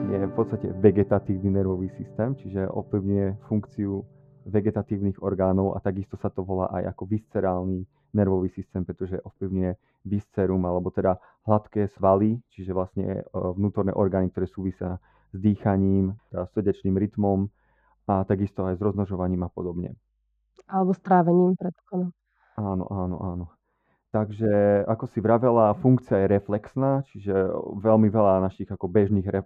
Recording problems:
muffled; very; fading above 2 kHz
background music; noticeable; throughout; 20 dB below the speech

